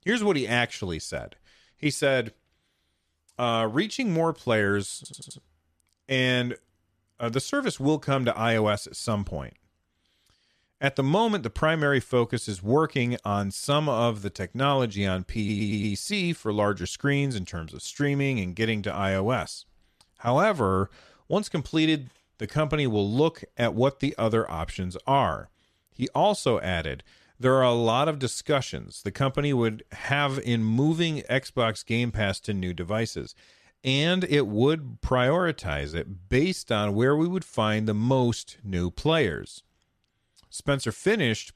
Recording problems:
audio stuttering; at 5 s and at 15 s

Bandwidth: 14 kHz